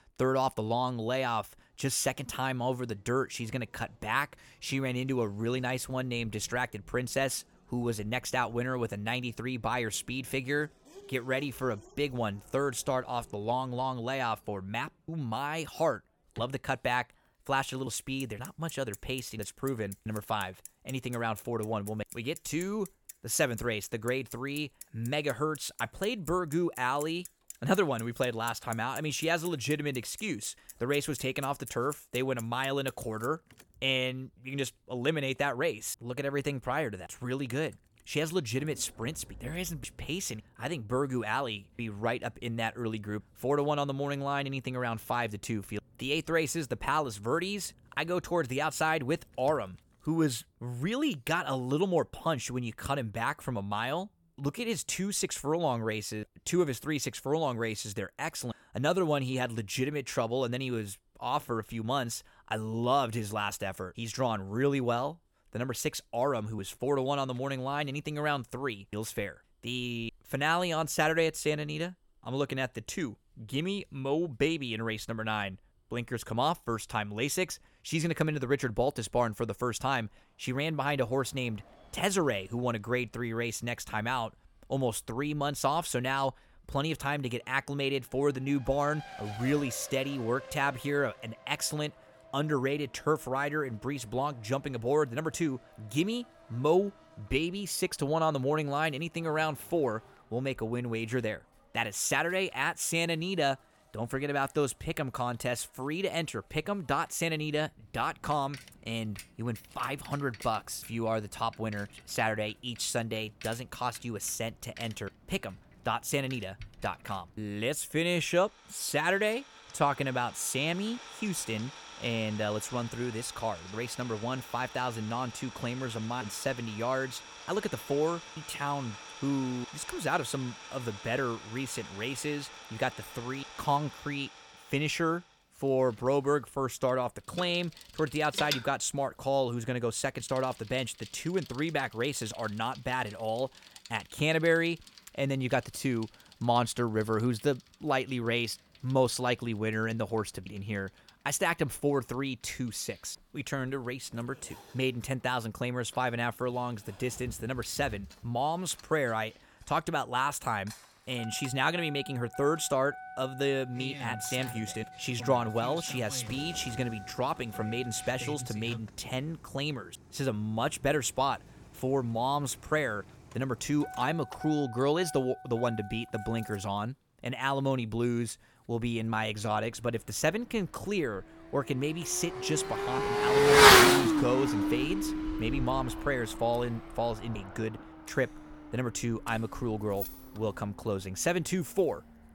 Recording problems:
traffic noise; loud; throughout; 2 dB below the speech
household noises; faint; from 2:17 on; 20 dB below the speech

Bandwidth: 18 kHz